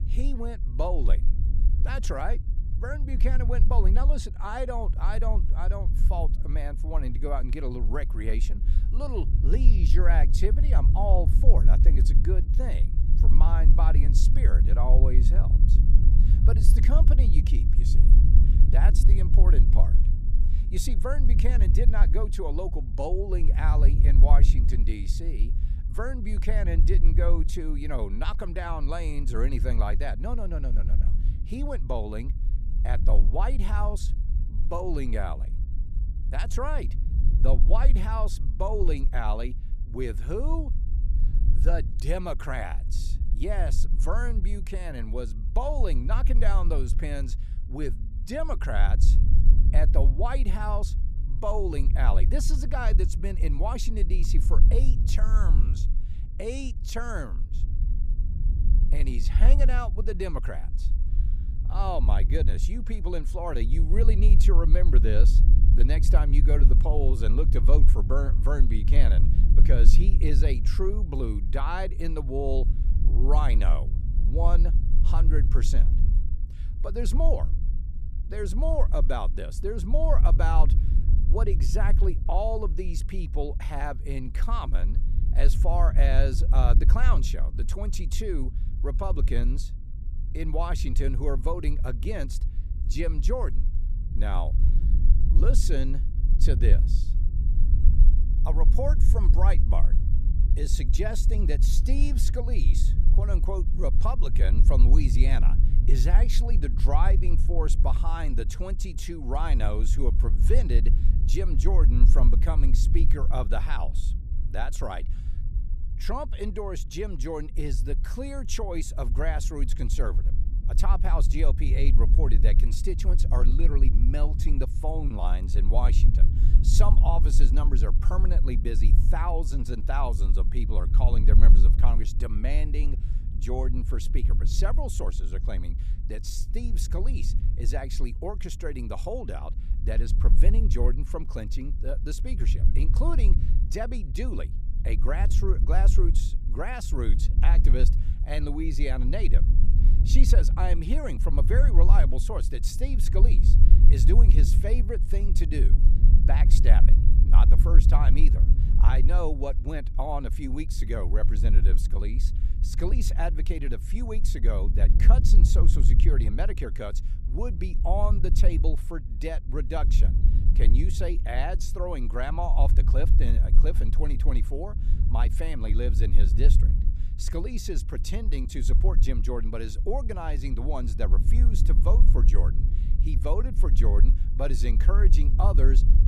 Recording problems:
low rumble; loud; throughout; 10 dB below the speech

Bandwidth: 14.5 kHz